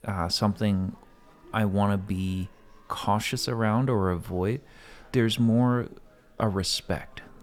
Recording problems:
murmuring crowd; faint; throughout; 30 dB below the speech

